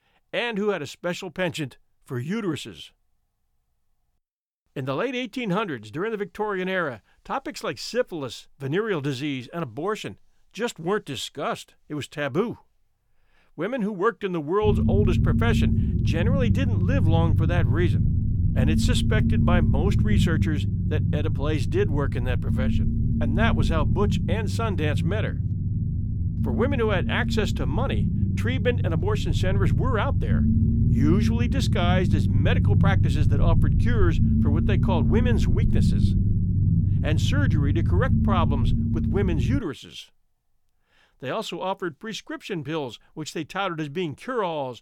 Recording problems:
low rumble; loud; from 15 to 40 s; 5 dB below the speech

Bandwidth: 18.5 kHz